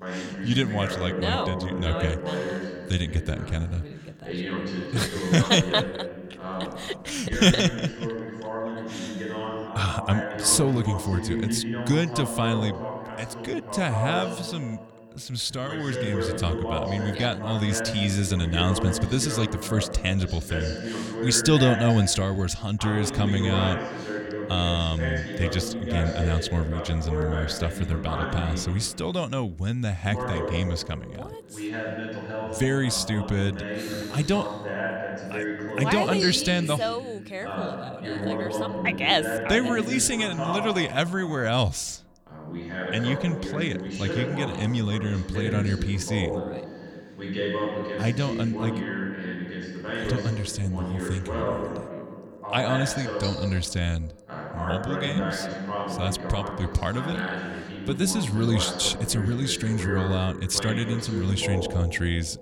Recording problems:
voice in the background; loud; throughout; 6 dB below the speech

